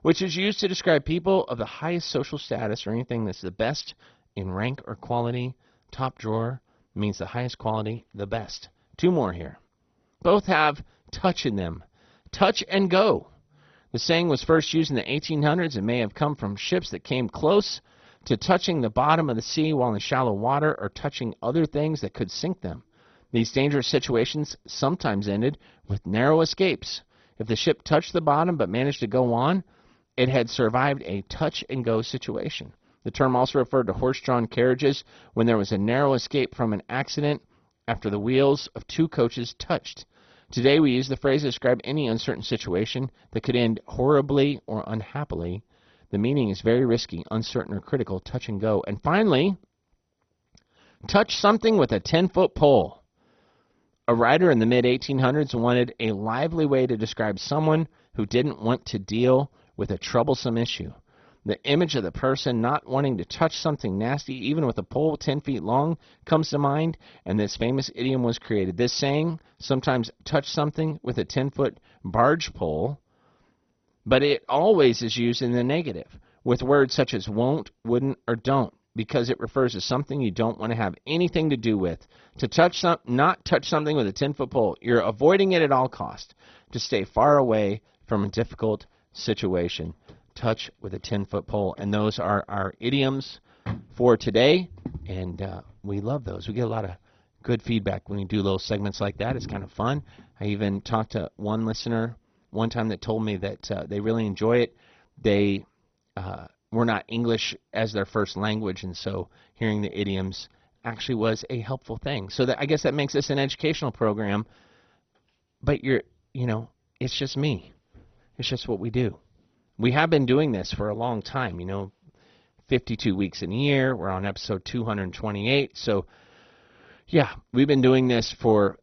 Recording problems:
garbled, watery; badly; nothing above 6 kHz

